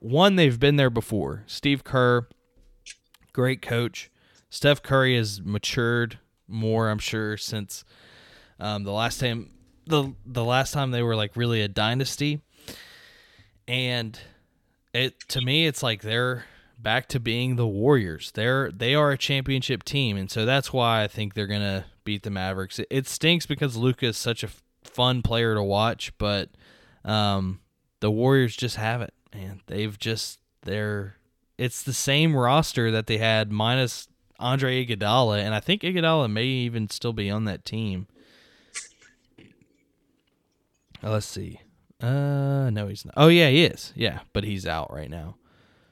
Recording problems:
none

